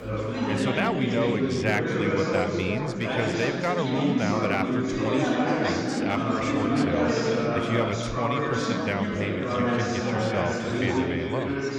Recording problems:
chatter from many people; very loud; throughout; 4 dB above the speech

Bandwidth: 18.5 kHz